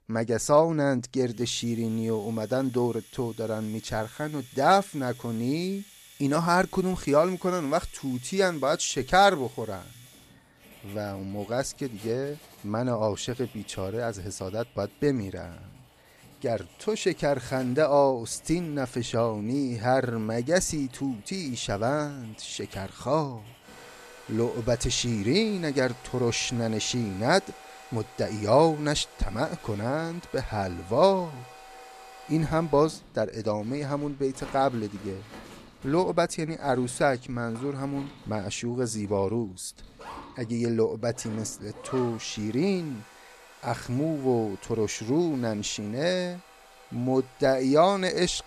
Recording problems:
household noises; faint; throughout; 20 dB below the speech

